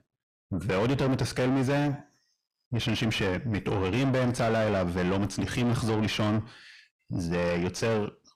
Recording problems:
distortion; heavy; 5 dB below the speech

